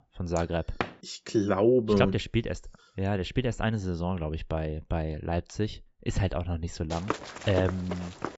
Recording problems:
high frequencies cut off; noticeable; nothing above 8 kHz
door banging; noticeable; at 1 s; peak 6 dB below the speech
footsteps; noticeable; from 7 s on; peak 5 dB below the speech

